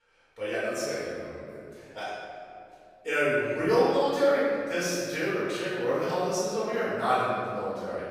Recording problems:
room echo; strong; dies away in 2.2 s
off-mic speech; far

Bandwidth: 15.5 kHz